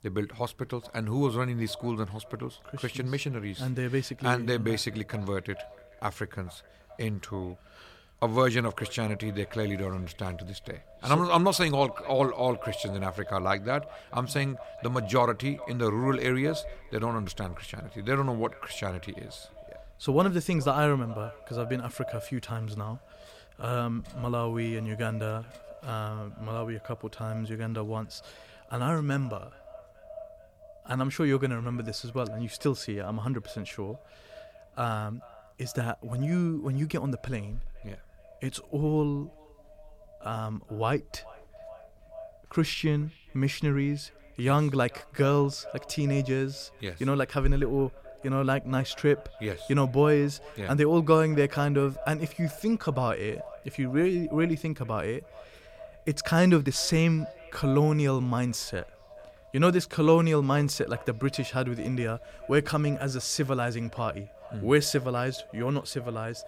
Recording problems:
echo of what is said; faint; throughout; 430 ms later, 20 dB below the speech

